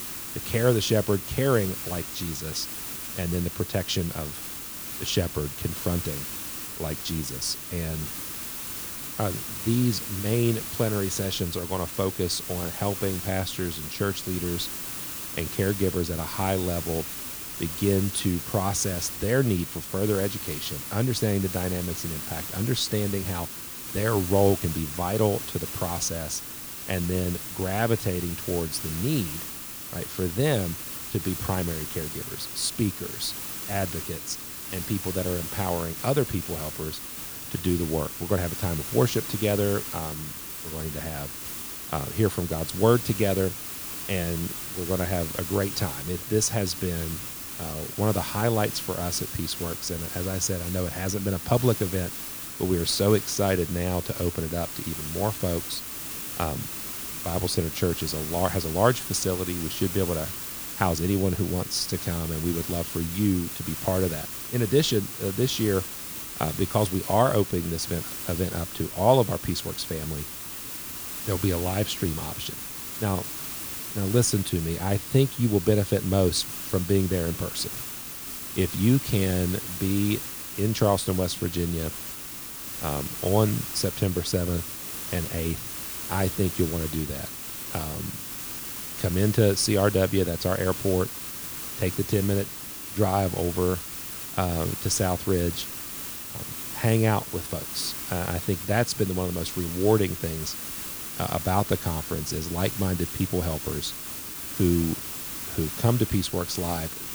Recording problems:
hiss; loud; throughout; 5 dB below the speech

